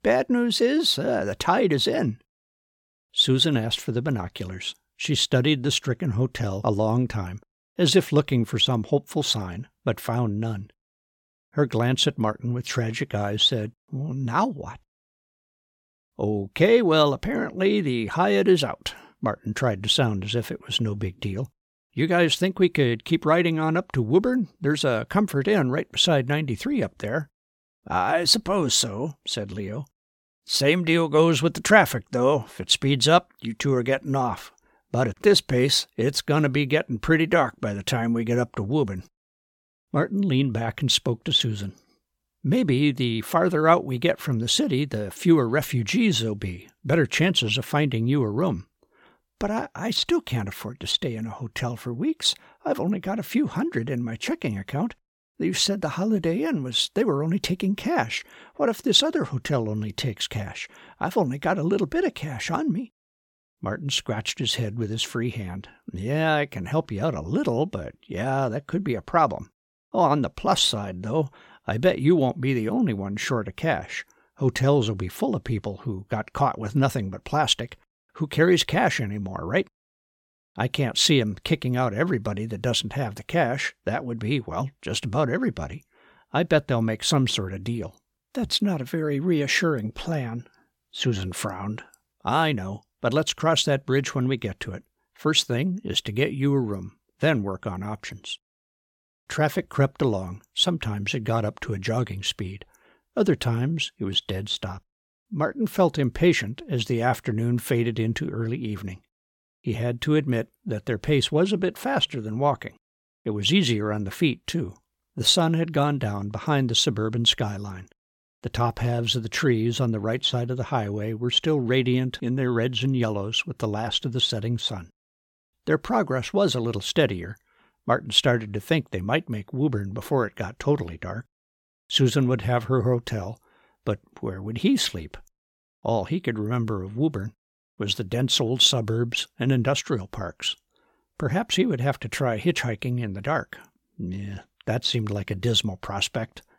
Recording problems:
none

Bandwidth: 17 kHz